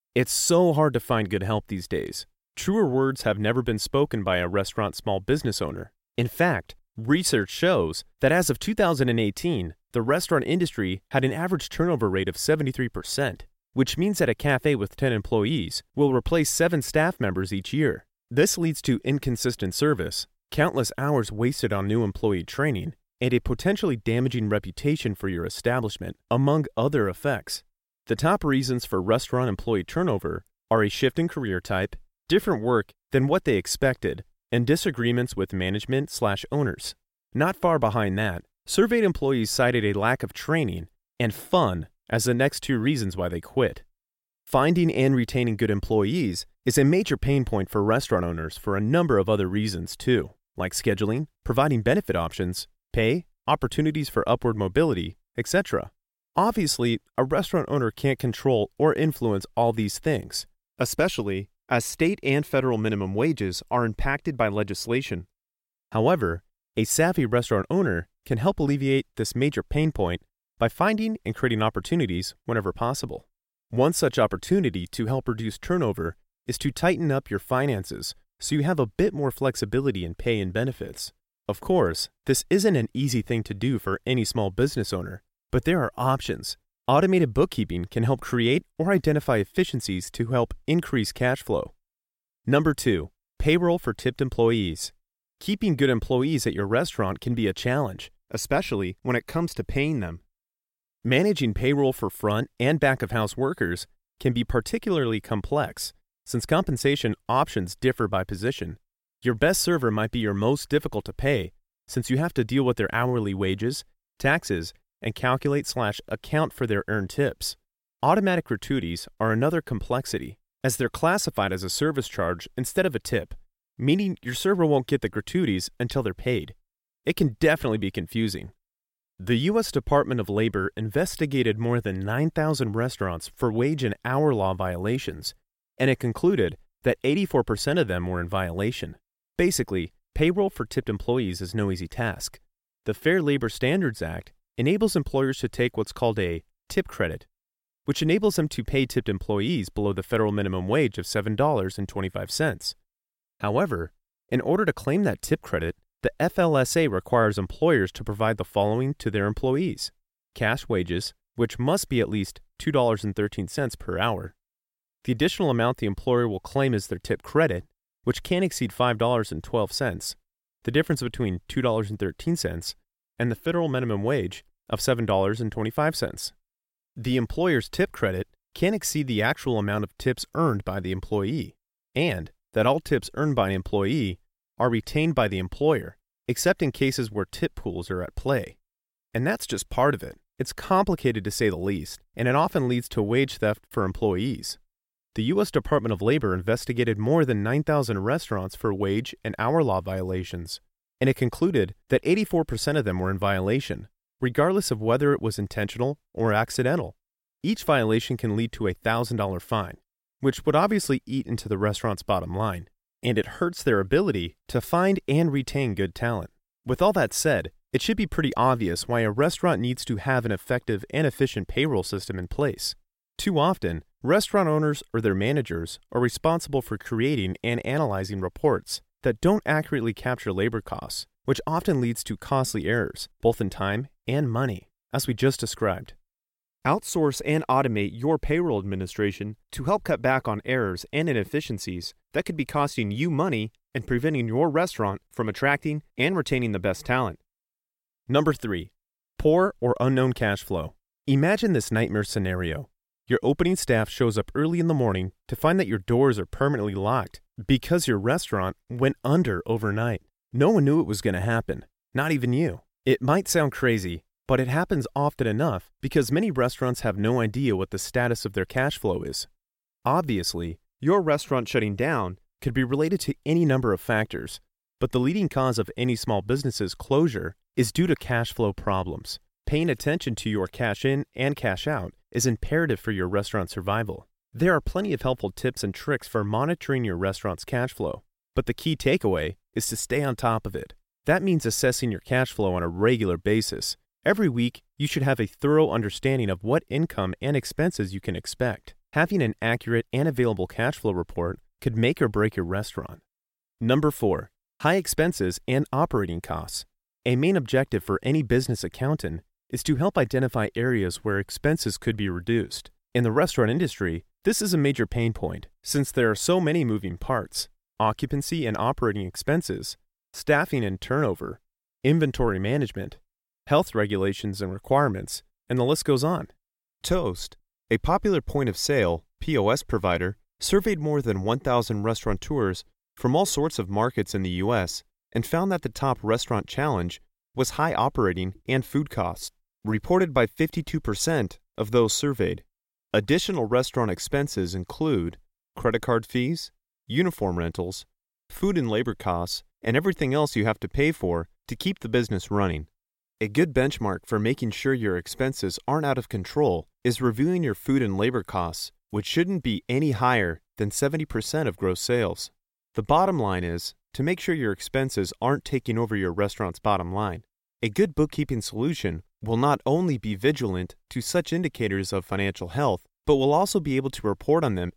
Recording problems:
none

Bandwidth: 16.5 kHz